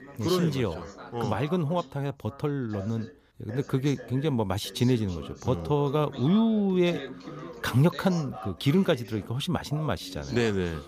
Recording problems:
background chatter; noticeable; throughout; 2 voices, 15 dB below the speech

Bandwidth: 15 kHz